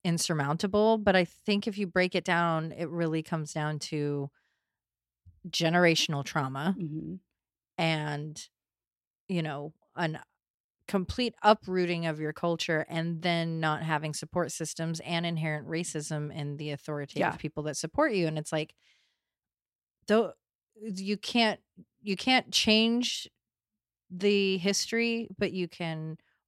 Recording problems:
none

